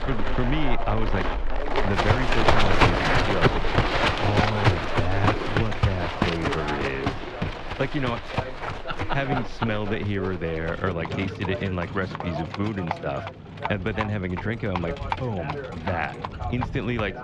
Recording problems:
muffled; very slightly; fading above 3 kHz
animal sounds; very loud; throughout; 2 dB above the speech
voice in the background; loud; throughout; 9 dB below the speech

